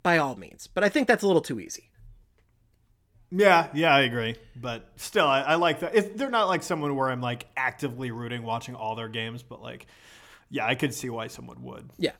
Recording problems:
none

